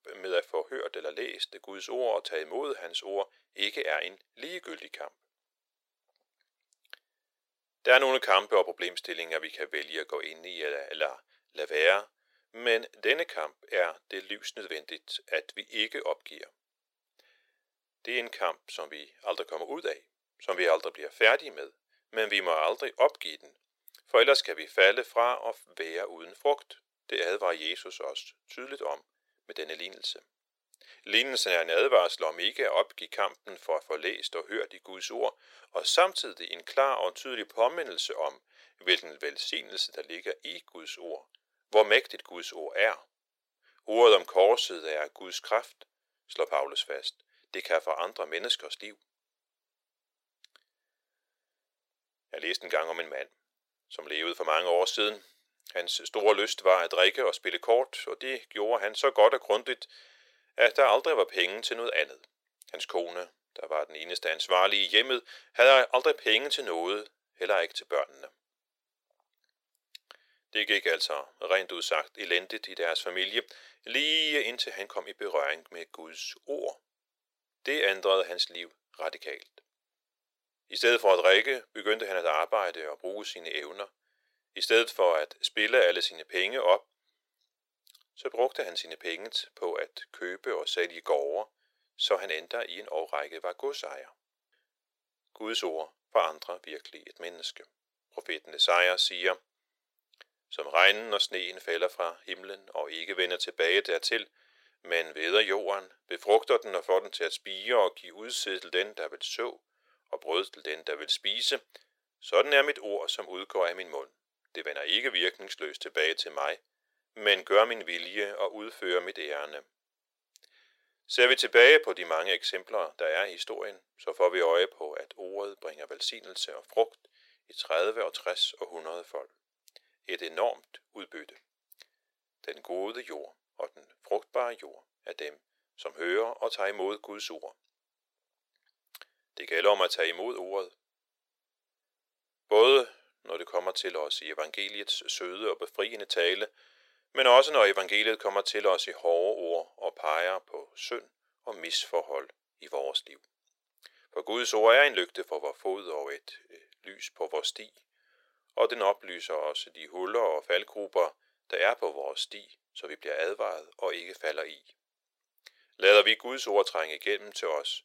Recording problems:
thin; very; fading below 450 Hz

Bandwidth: 16 kHz